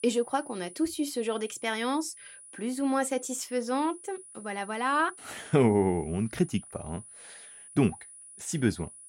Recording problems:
high-pitched whine; noticeable; throughout; 9.5 kHz, 15 dB below the speech

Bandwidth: 16 kHz